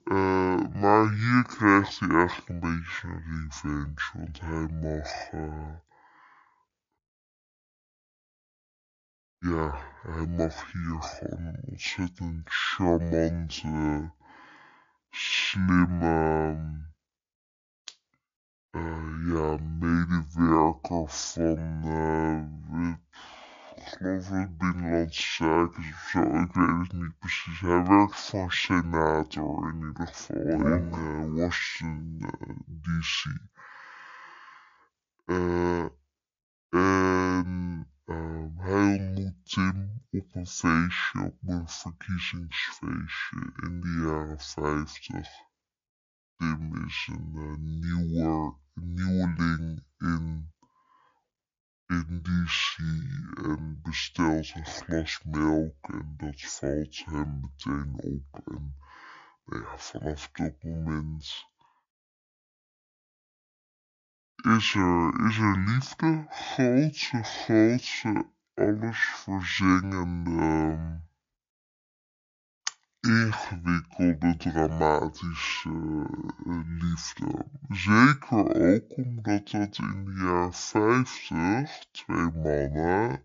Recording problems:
wrong speed and pitch; too slow and too low; 0.5 times normal speed

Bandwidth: 7 kHz